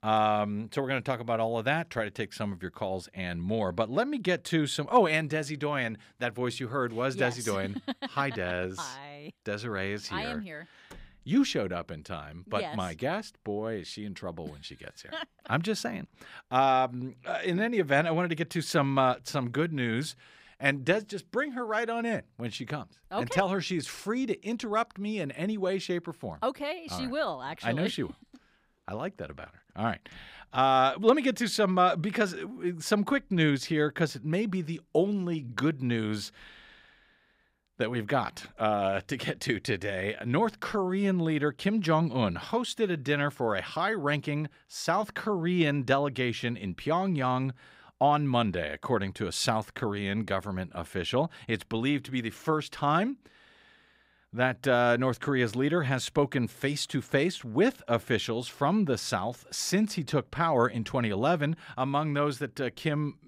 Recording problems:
none

